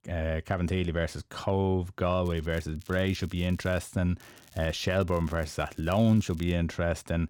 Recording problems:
crackling; faint; from 2 to 4 s and from 4 to 6.5 s; 25 dB below the speech

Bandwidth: 17 kHz